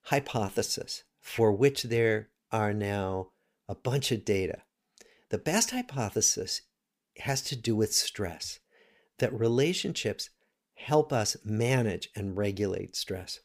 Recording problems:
none

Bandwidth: 15 kHz